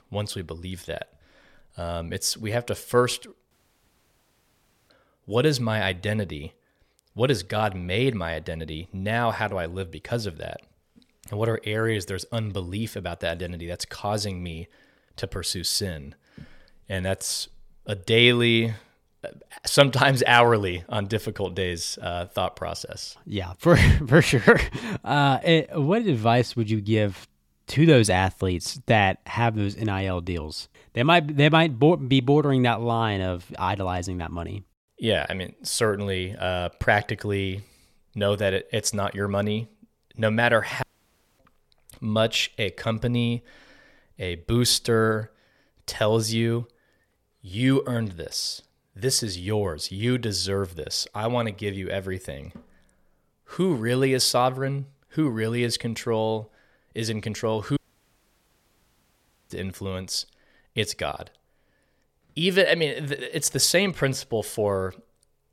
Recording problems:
audio cutting out; at 3.5 s for 1.5 s, at 41 s for 0.5 s and at 58 s for 1.5 s

